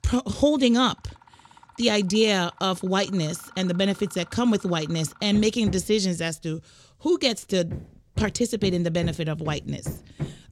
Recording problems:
machinery noise; noticeable; throughout; 15 dB below the speech

